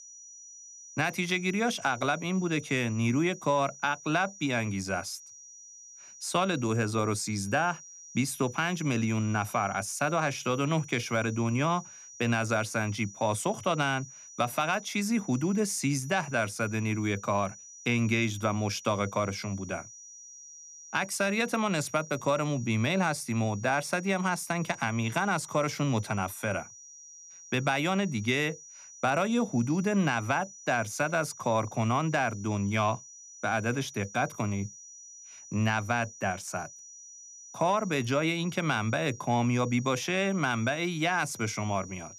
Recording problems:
high-pitched whine; noticeable; throughout; 6 kHz, 15 dB below the speech

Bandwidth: 14.5 kHz